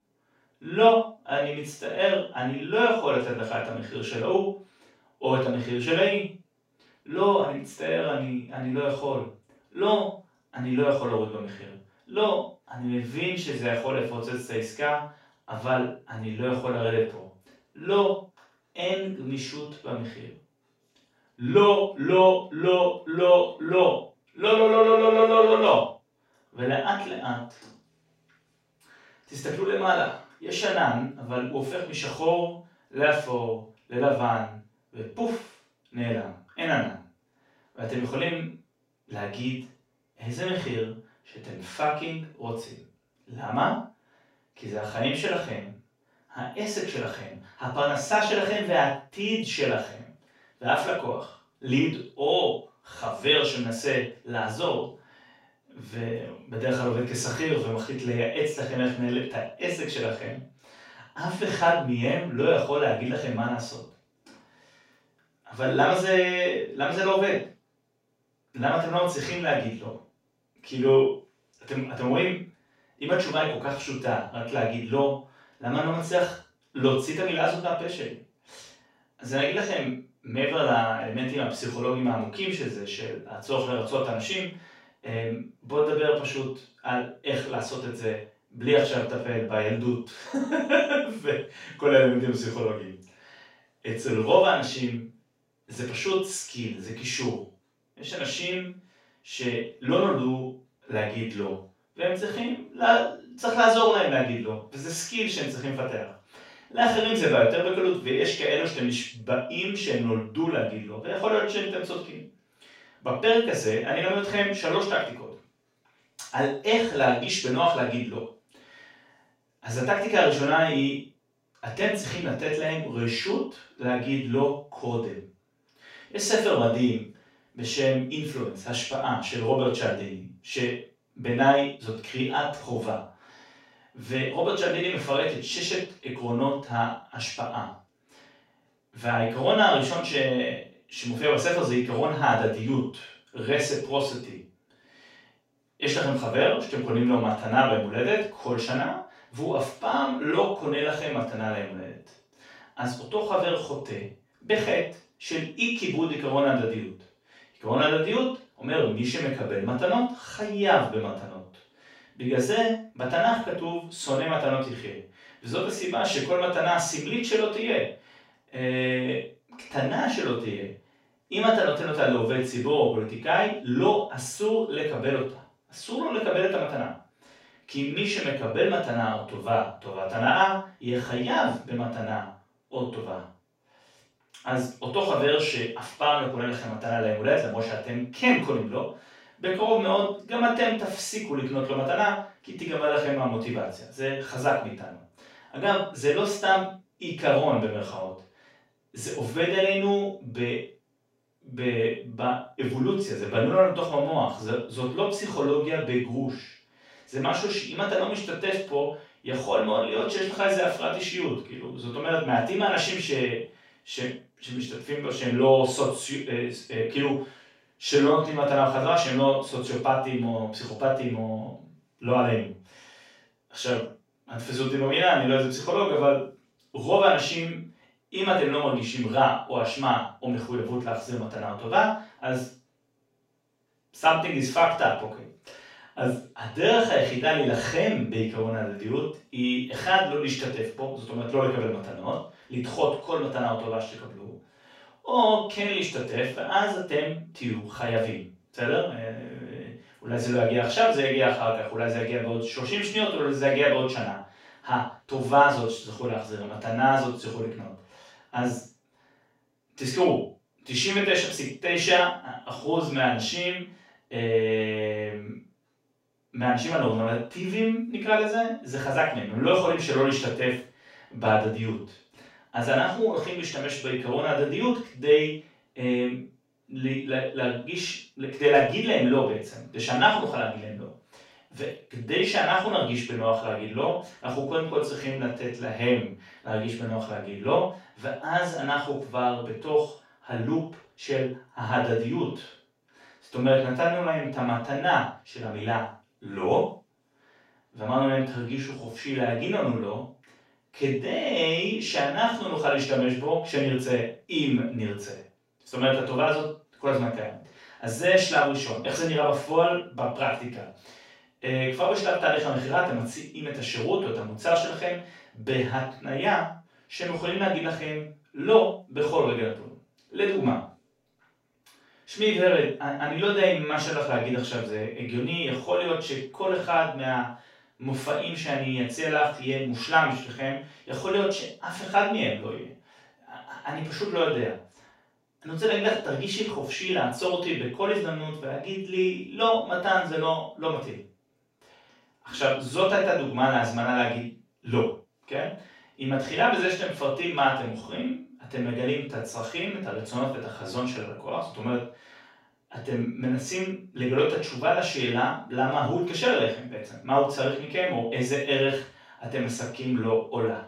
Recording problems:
off-mic speech; far
room echo; noticeable; dies away in 0.4 s

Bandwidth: 16 kHz